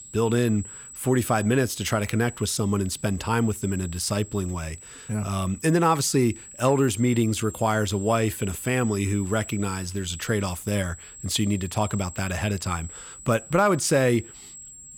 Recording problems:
high-pitched whine; noticeable; throughout; 8 kHz, 15 dB below the speech

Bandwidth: 17.5 kHz